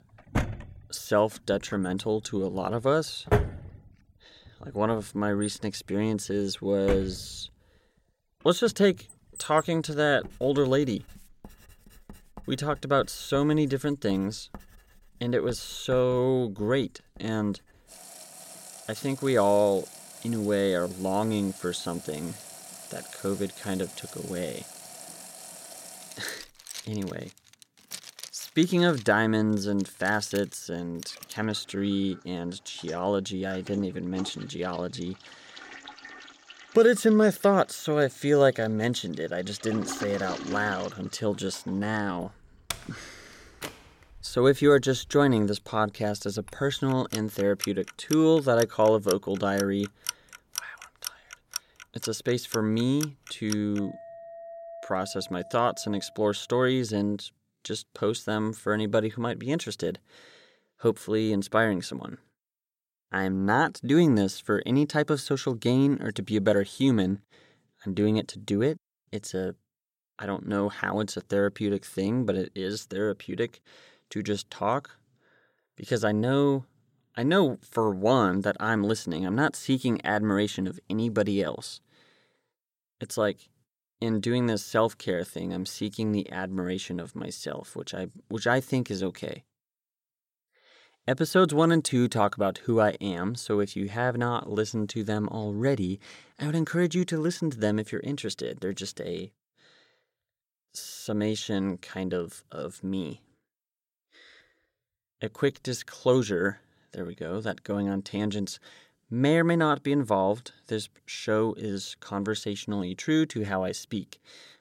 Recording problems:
household noises; noticeable; until 56 s; 15 dB below the speech

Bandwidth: 16.5 kHz